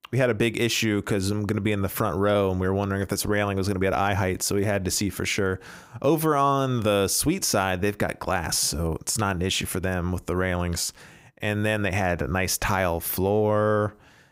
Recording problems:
none

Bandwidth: 15.5 kHz